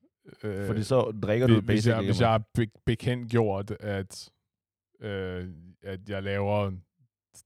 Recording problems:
none

